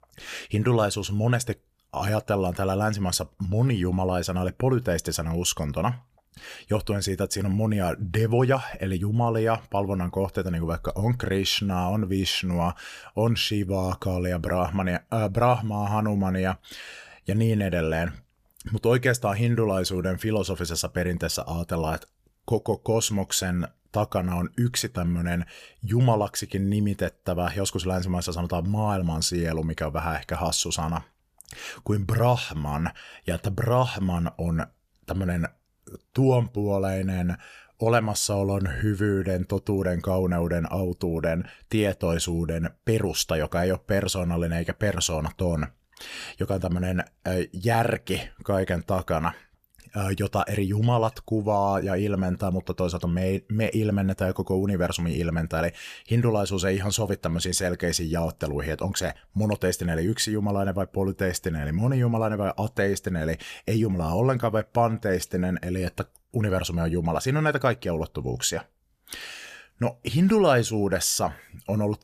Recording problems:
none

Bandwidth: 14.5 kHz